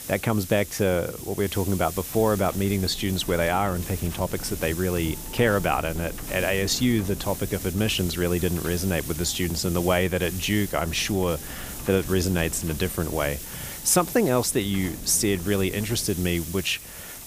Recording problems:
wind noise on the microphone; occasional gusts; 20 dB below the speech
hiss; noticeable; throughout; 10 dB below the speech

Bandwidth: 15 kHz